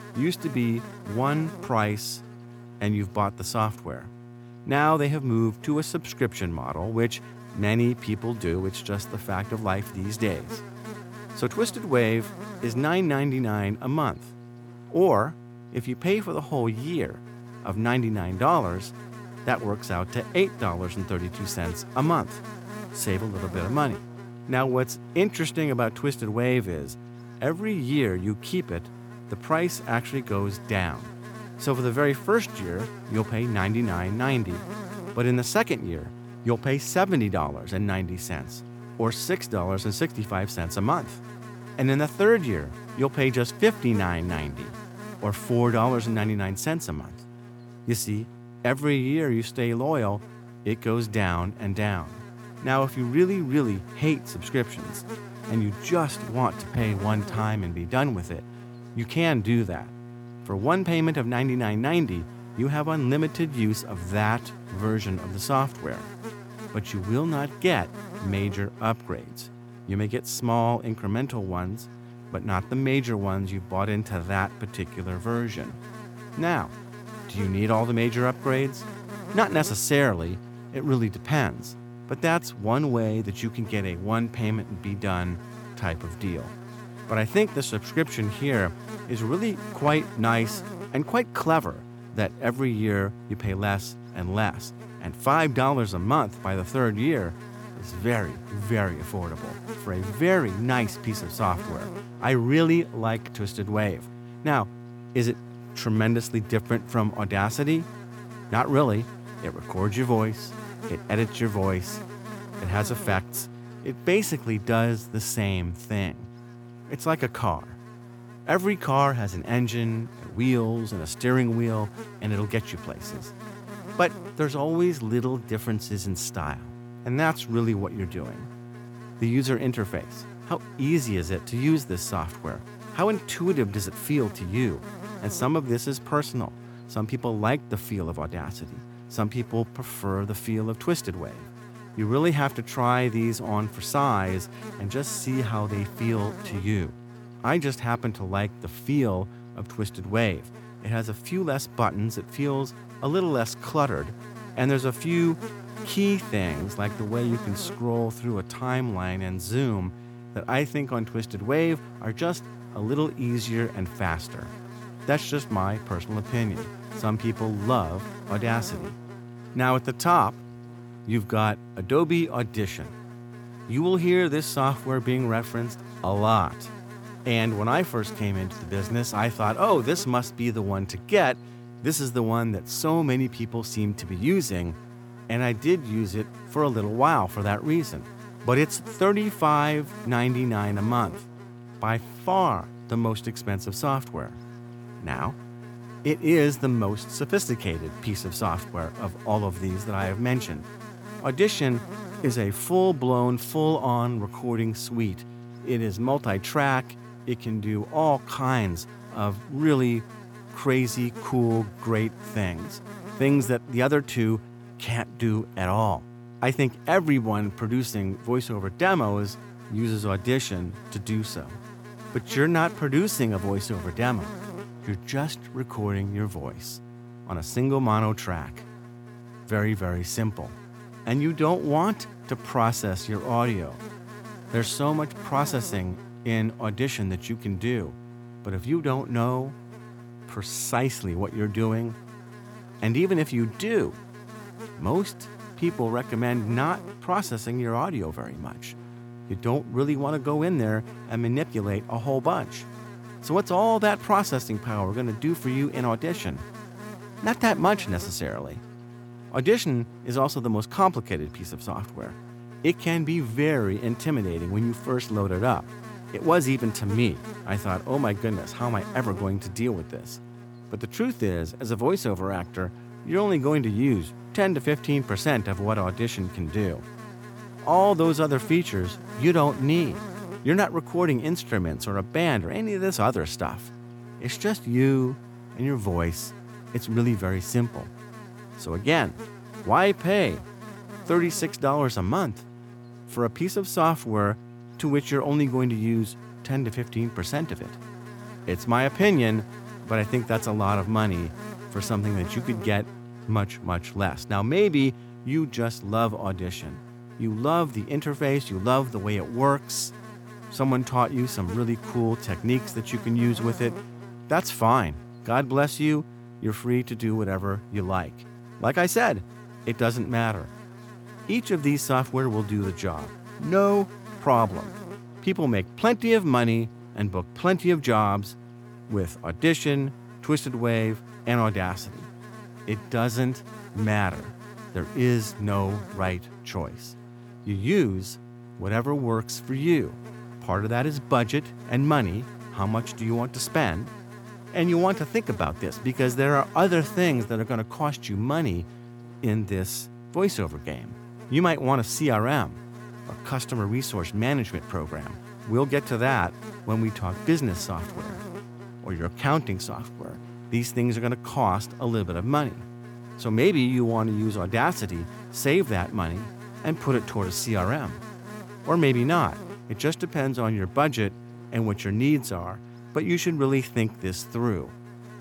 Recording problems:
electrical hum; noticeable; throughout; 60 Hz, 15 dB below the speech

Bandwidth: 18 kHz